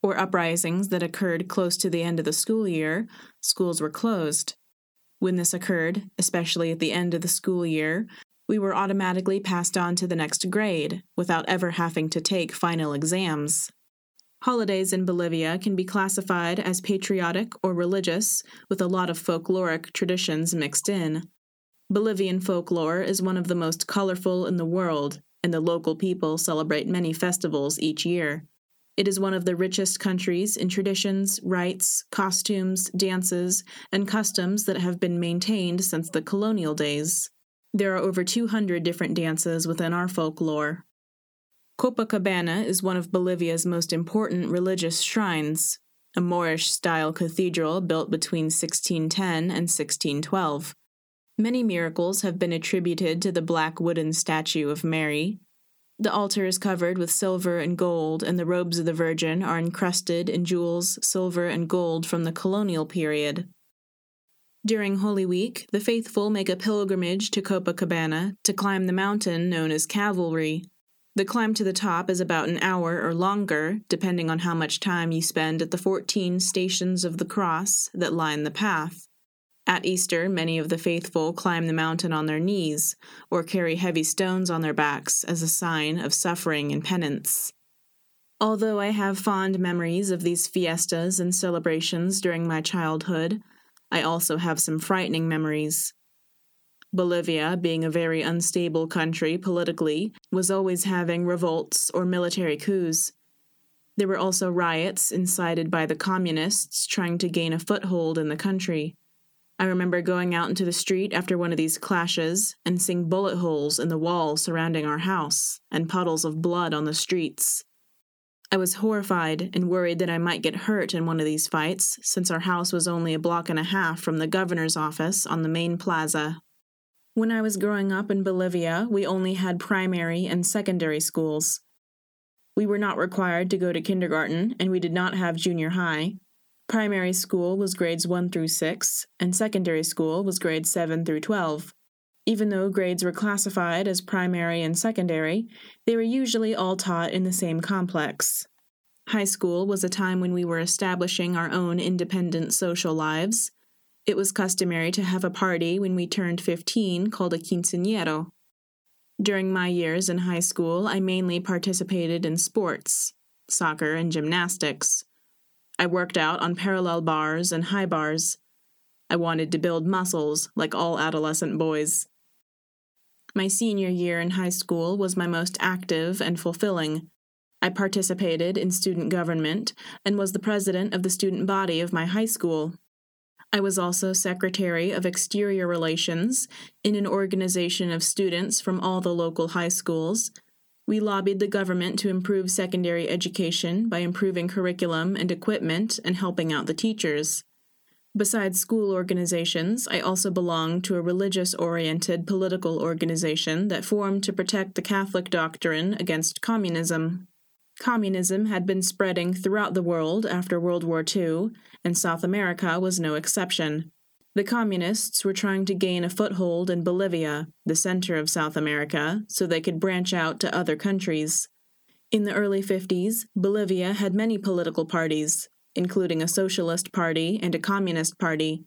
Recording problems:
squashed, flat; somewhat

